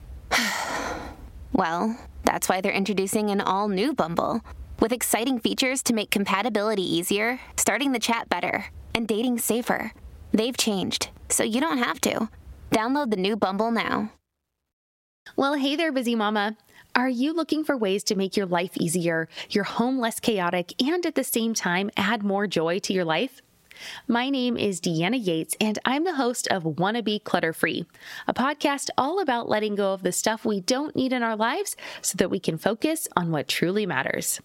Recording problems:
squashed, flat; somewhat

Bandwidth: 16 kHz